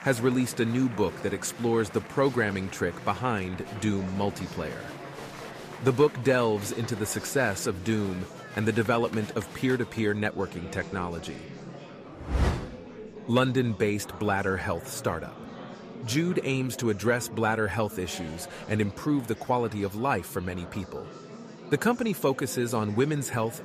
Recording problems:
murmuring crowd; noticeable; throughout; 15 dB below the speech

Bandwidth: 14.5 kHz